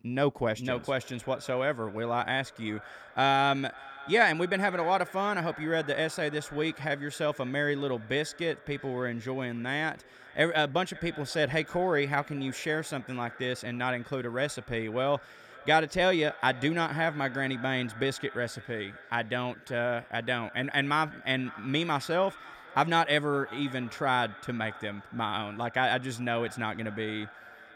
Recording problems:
echo of what is said; noticeable; throughout; 550 ms later, 15 dB below the speech

